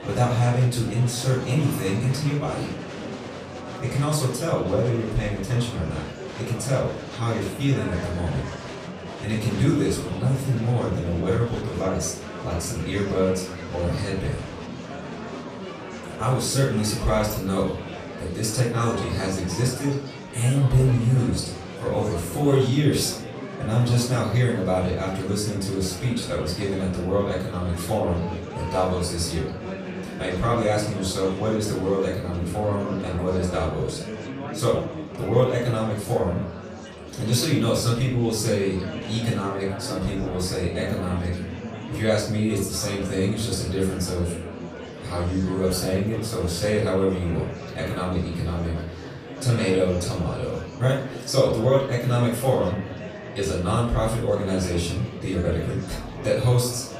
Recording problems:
off-mic speech; far
room echo; noticeable; dies away in 0.5 s
murmuring crowd; noticeable; throughout; 10 dB below the speech

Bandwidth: 14.5 kHz